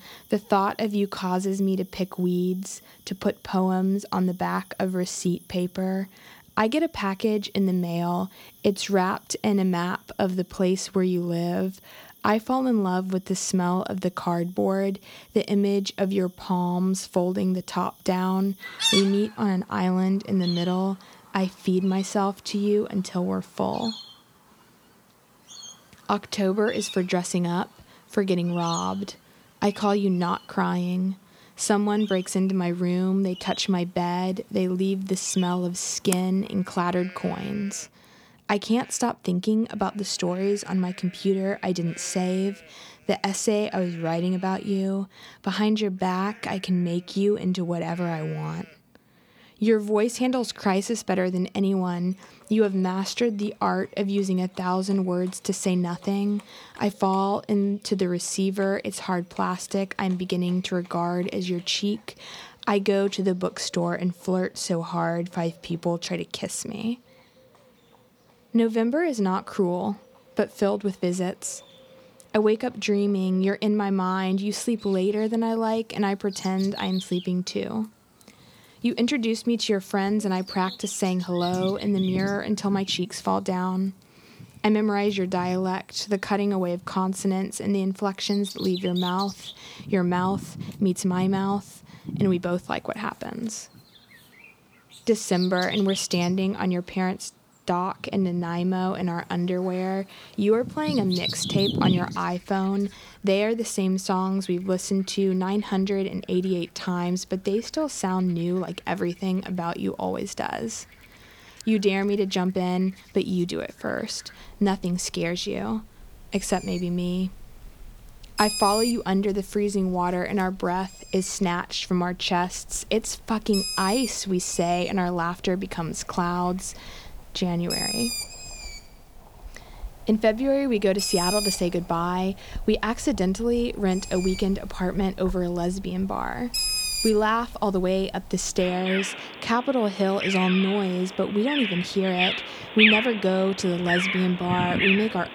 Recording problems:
animal sounds; loud; throughout; 5 dB below the speech

